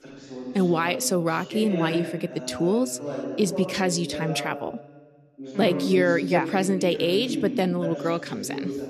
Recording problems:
voice in the background; loud; throughout; 8 dB below the speech

